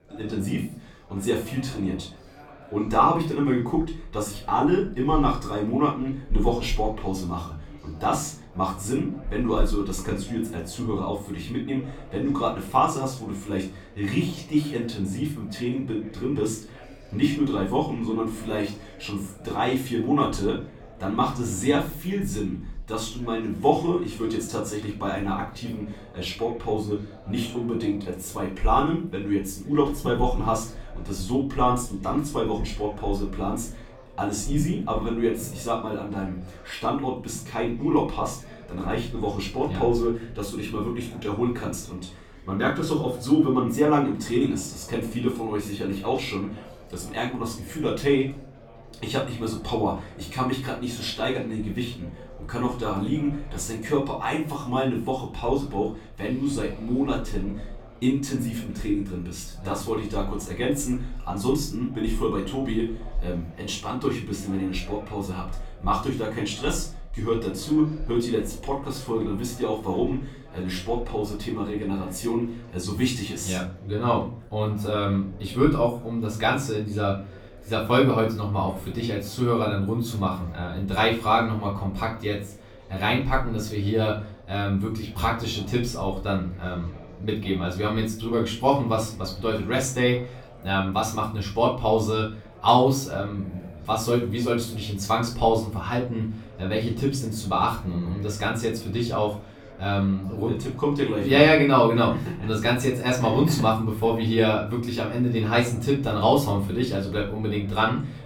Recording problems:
off-mic speech; far
room echo; slight; dies away in 0.3 s
chatter from many people; faint; throughout; 20 dB below the speech

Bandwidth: 17 kHz